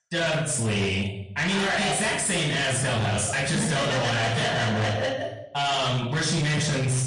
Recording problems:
distortion; heavy; 34% of the sound clipped
off-mic speech; far
room echo; noticeable; dies away in 0.7 s
garbled, watery; slightly

